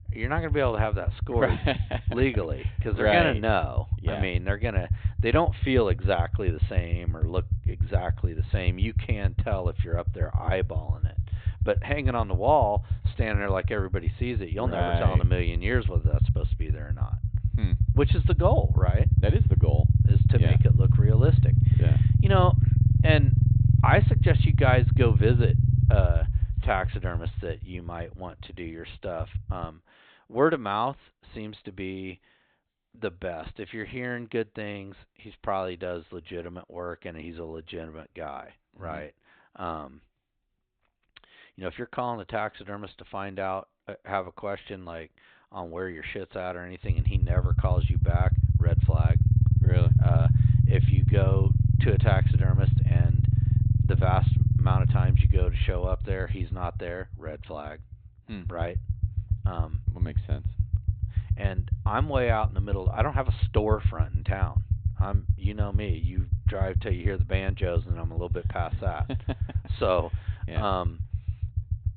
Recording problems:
high frequencies cut off; severe; nothing above 4 kHz
low rumble; loud; until 30 s and from 47 s on; 9 dB below the speech

